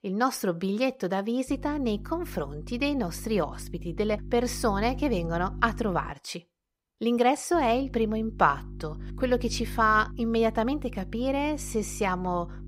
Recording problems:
electrical hum; faint; from 1.5 to 6 s and from 7.5 s on; 50 Hz, 25 dB below the speech

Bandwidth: 15.5 kHz